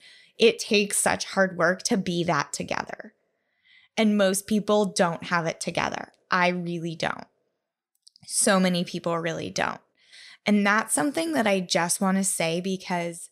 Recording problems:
none

